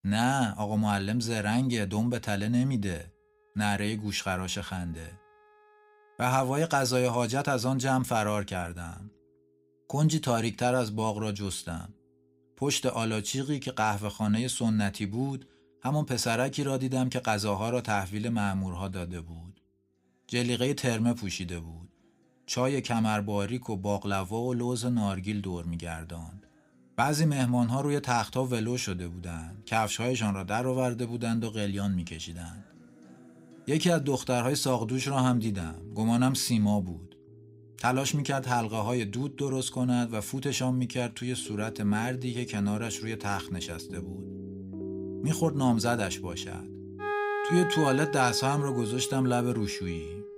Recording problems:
background music; noticeable; throughout; 10 dB below the speech

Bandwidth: 15.5 kHz